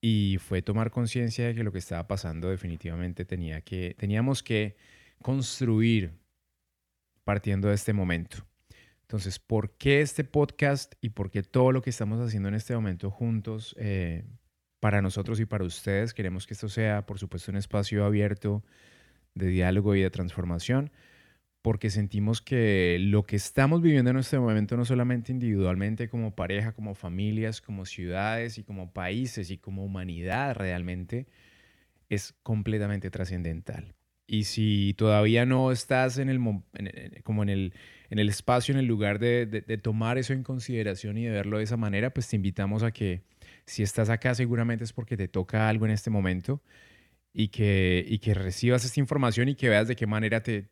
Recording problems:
none

